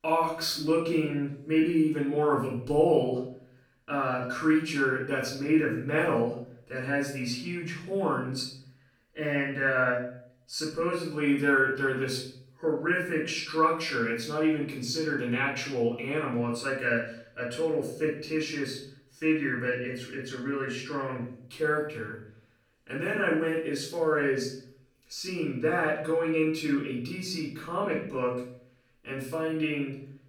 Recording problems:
off-mic speech; far
room echo; noticeable; dies away in 0.5 s

